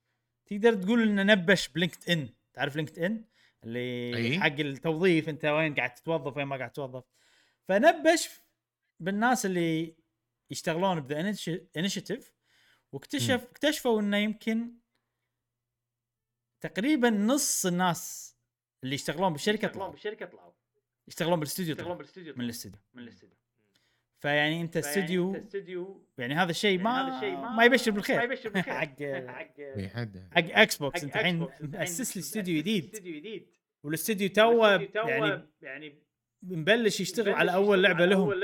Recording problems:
echo of what is said; strong; from 19 s on; 580 ms later, 10 dB below the speech

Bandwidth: 18 kHz